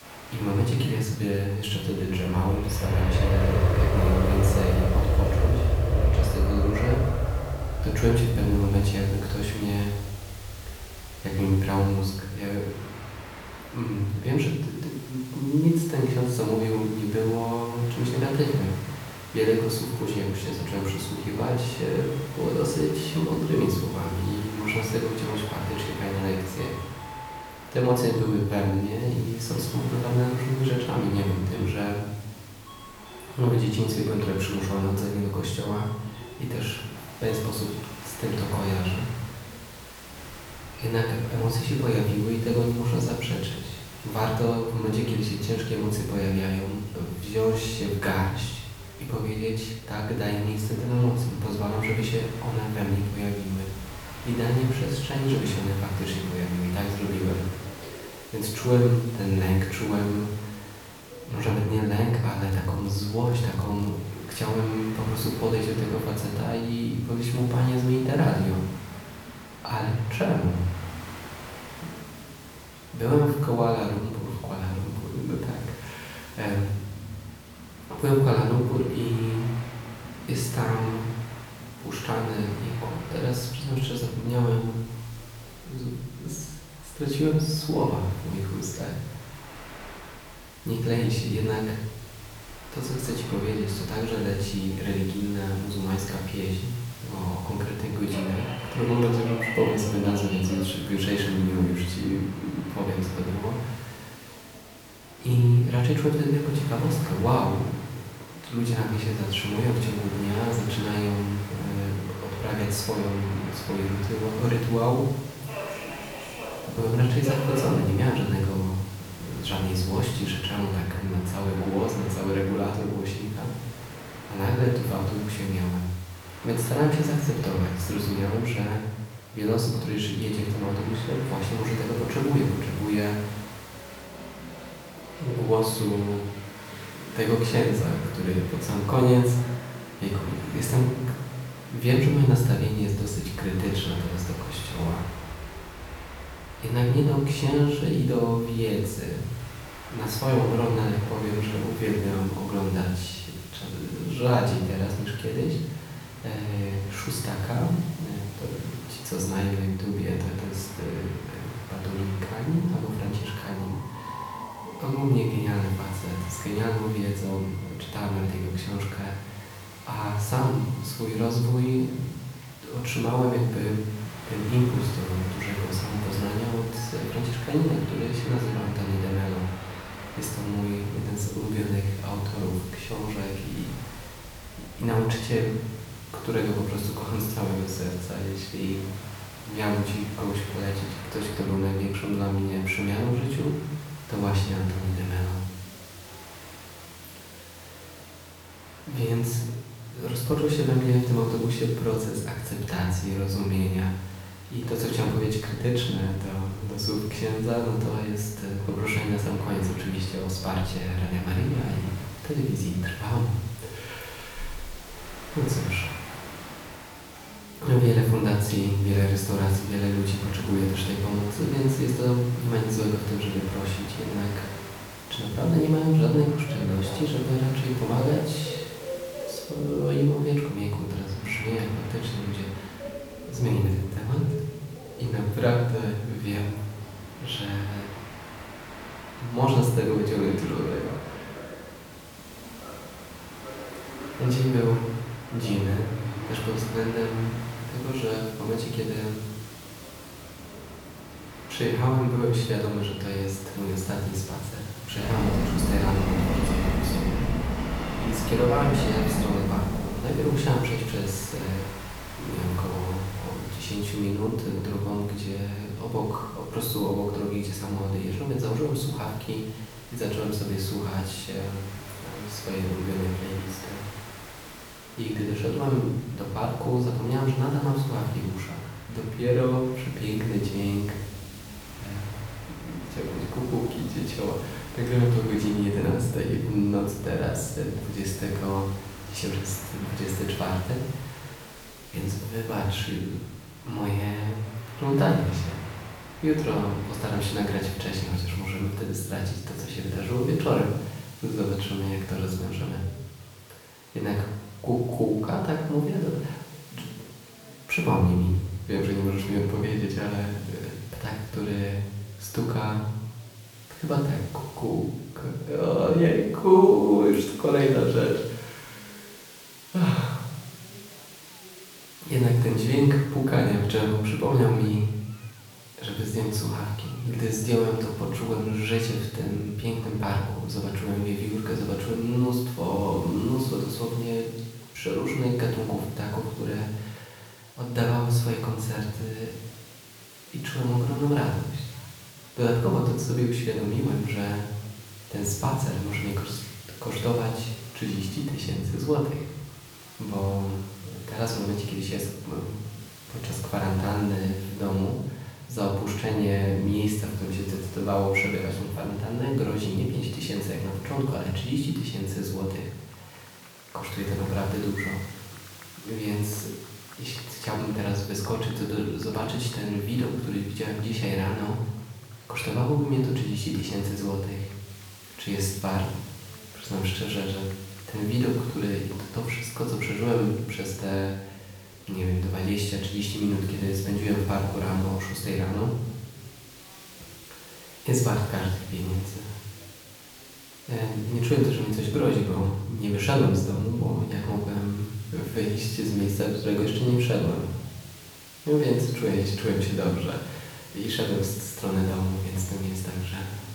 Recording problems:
off-mic speech; far
room echo; noticeable; dies away in 0.8 s
train or aircraft noise; noticeable; until 4:58; 10 dB below the speech
hiss; noticeable; throughout; 20 dB below the speech
murmuring crowd; faint; throughout; 25 dB below the speech
crackling; faint; from 1:02 to 1:04; 25 dB below the speech

